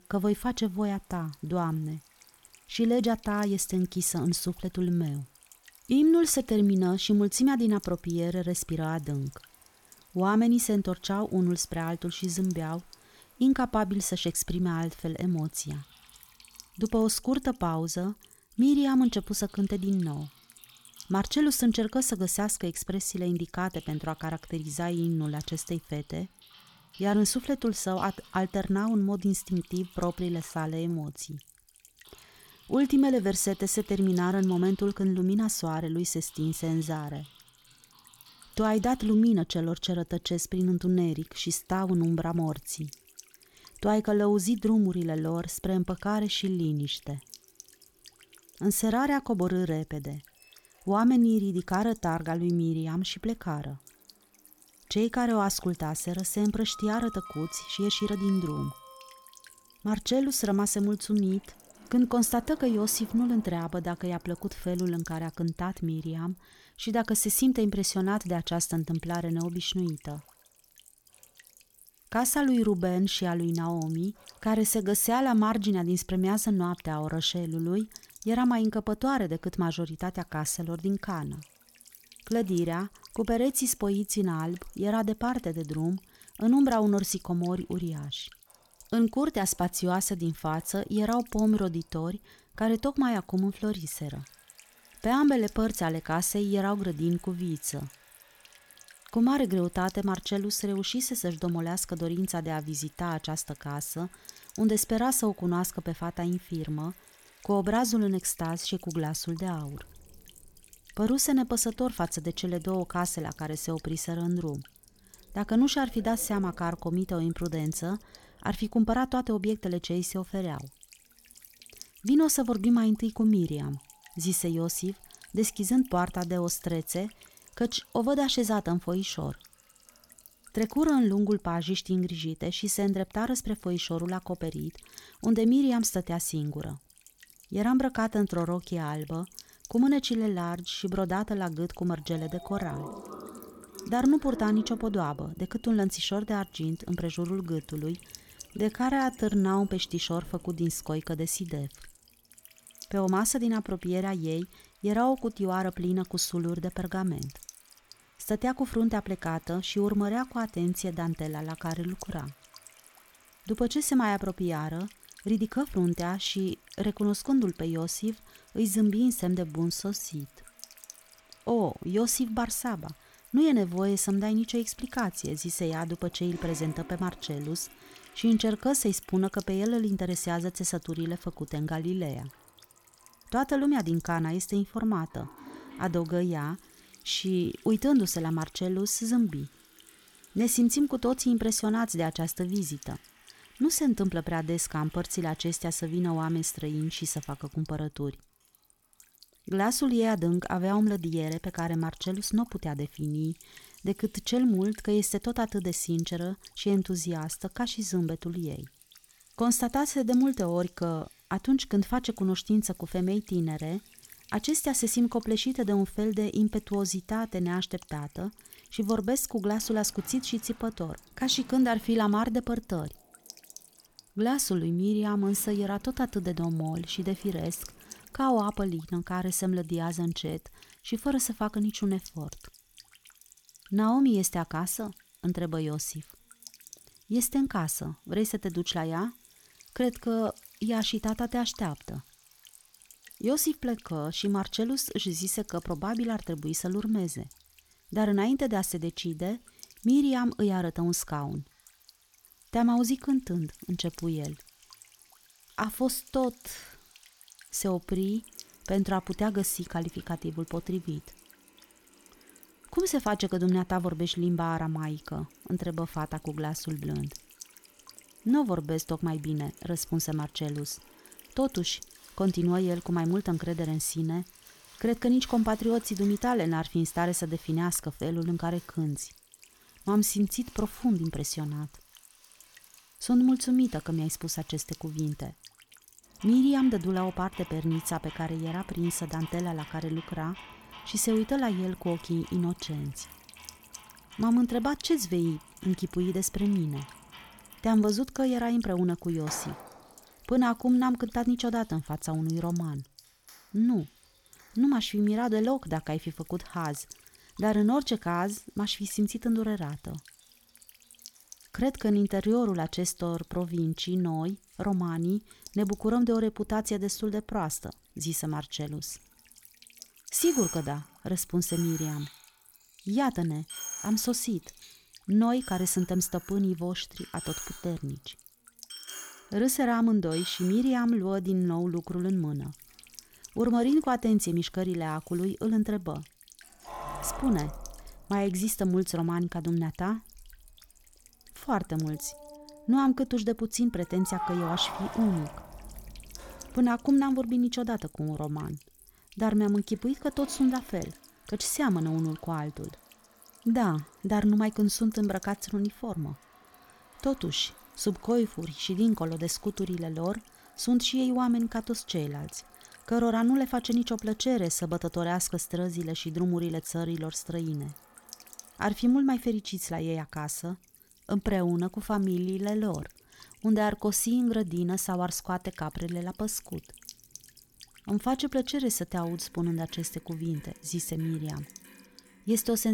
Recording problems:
electrical hum; faint; throughout; 50 Hz, 20 dB below the speech
household noises; faint; throughout; 20 dB below the speech
uneven, jittery; strongly; from 52 s to 2:51
abrupt cut into speech; at the end

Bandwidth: 18 kHz